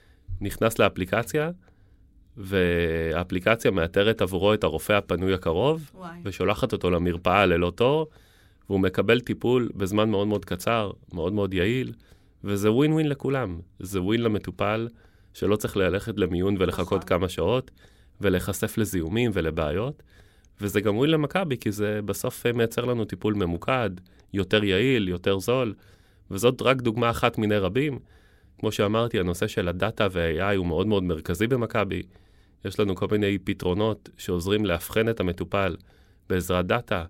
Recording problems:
none

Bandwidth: 16 kHz